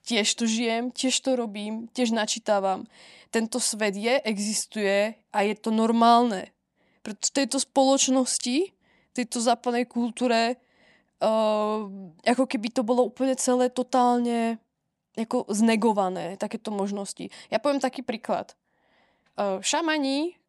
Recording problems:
none

